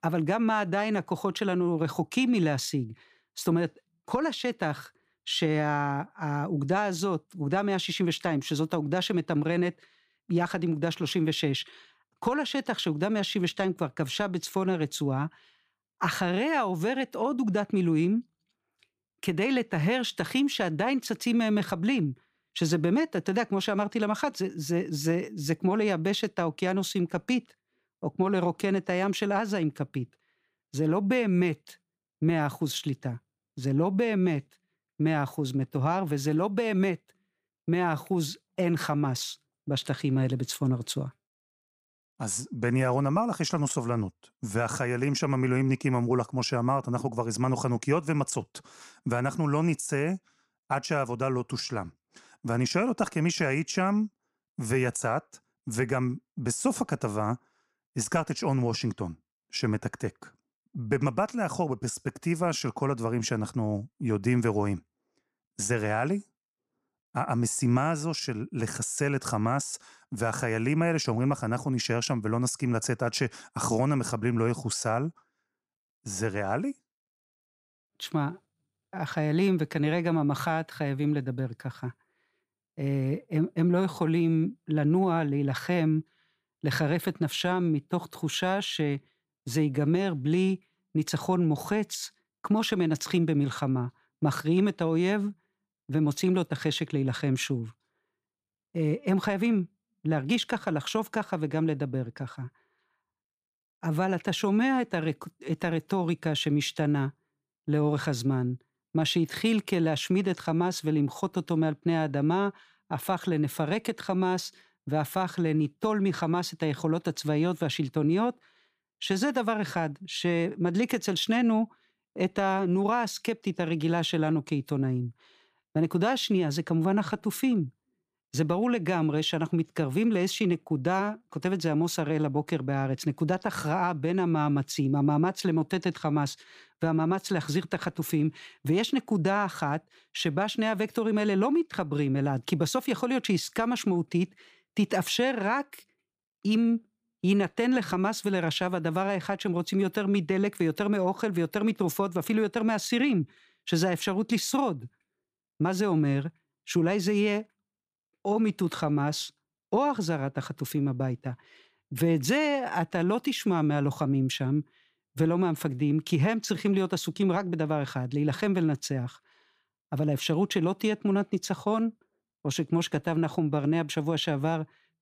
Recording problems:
none

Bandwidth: 15 kHz